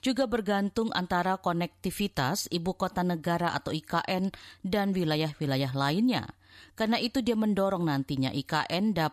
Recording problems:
none

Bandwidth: 14.5 kHz